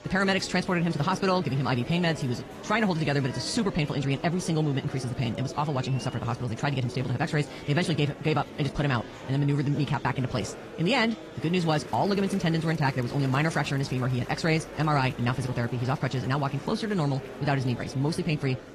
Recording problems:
wrong speed, natural pitch; too fast; 1.7 times normal speed
garbled, watery; slightly
murmuring crowd; noticeable; throughout; 15 dB below the speech

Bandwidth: 14.5 kHz